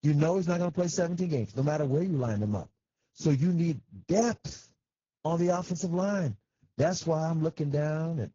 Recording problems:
garbled, watery; badly
high frequencies cut off; noticeable; nothing above 7 kHz

